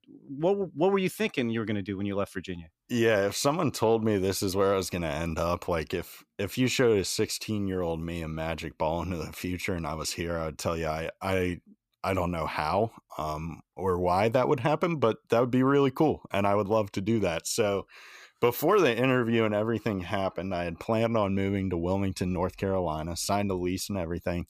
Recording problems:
none

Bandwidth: 15 kHz